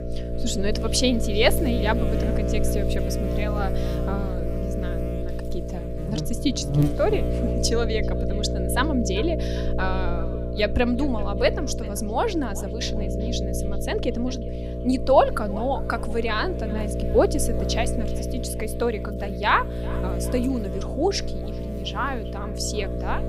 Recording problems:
echo of what is said; faint; throughout; 390 ms later, 20 dB below the speech
electrical hum; loud; throughout; 60 Hz, 7 dB below the speech

